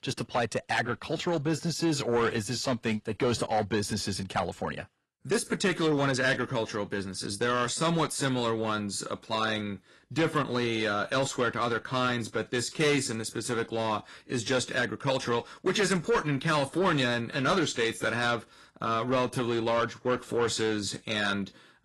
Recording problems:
distortion; slight; 10 dB below the speech
garbled, watery; slightly

